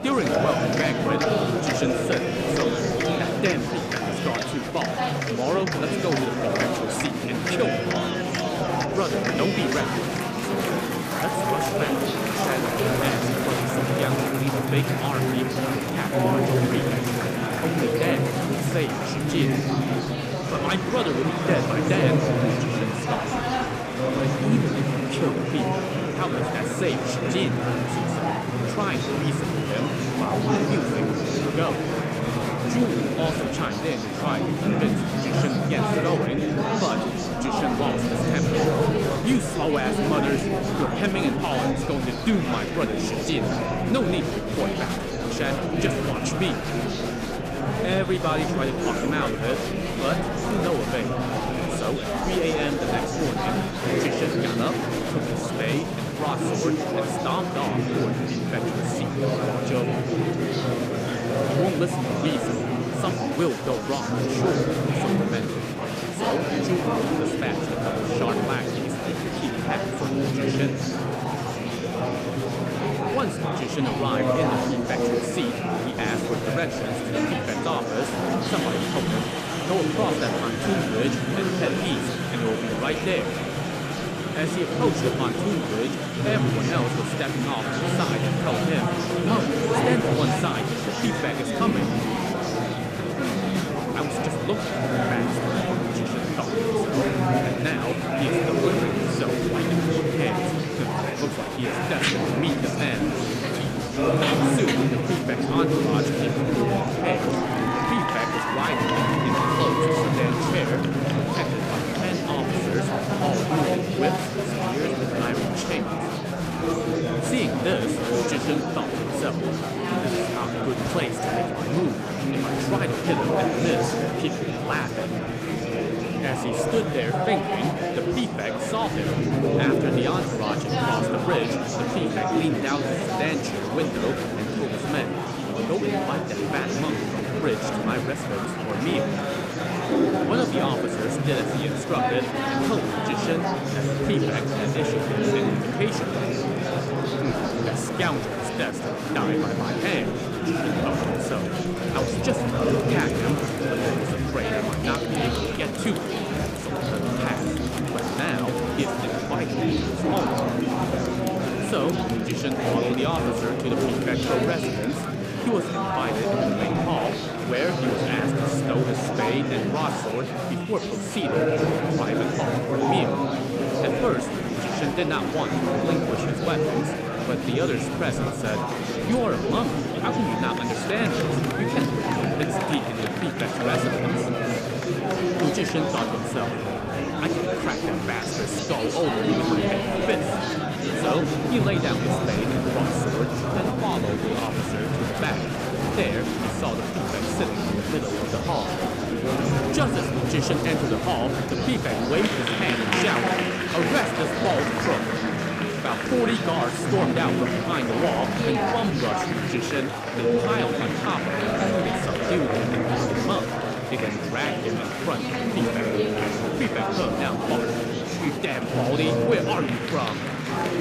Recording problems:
murmuring crowd; very loud; throughout; 4 dB above the speech

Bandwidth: 14.5 kHz